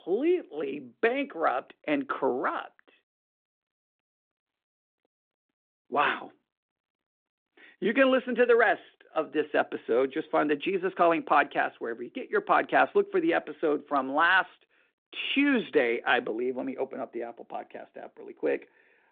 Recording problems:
phone-call audio

